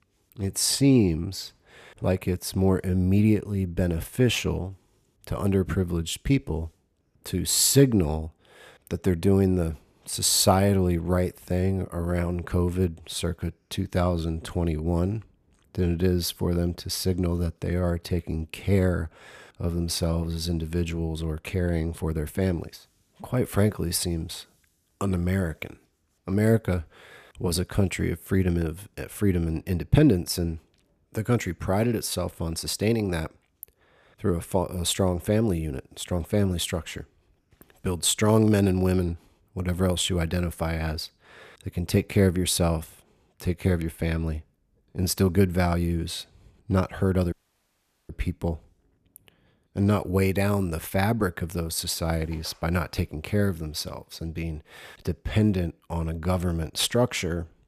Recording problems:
audio cutting out; at 47 s for 1 s

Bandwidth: 14.5 kHz